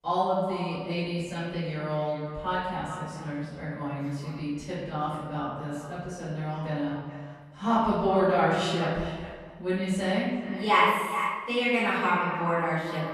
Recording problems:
echo of what is said; strong; throughout; 430 ms later, 10 dB below the speech
room echo; strong; dies away in 1.4 s
off-mic speech; far

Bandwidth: 14.5 kHz